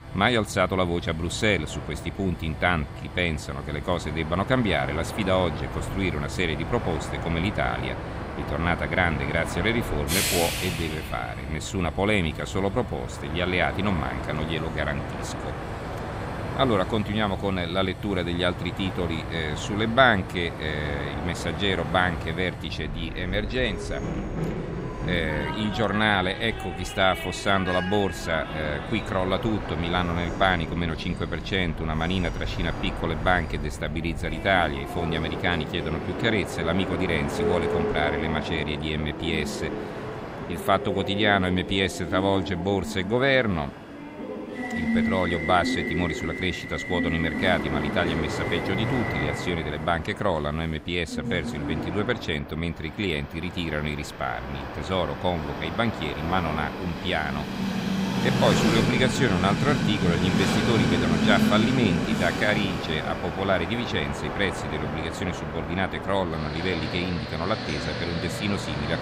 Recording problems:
train or aircraft noise; loud; throughout; 4 dB below the speech

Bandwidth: 15.5 kHz